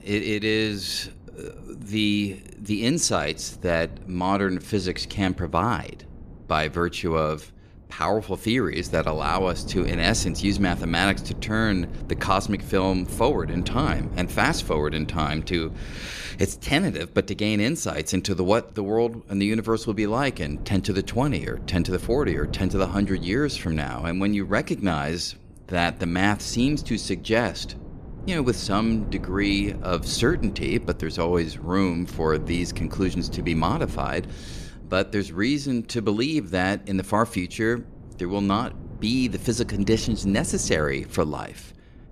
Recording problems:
wind noise on the microphone; occasional gusts; 20 dB below the speech

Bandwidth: 14.5 kHz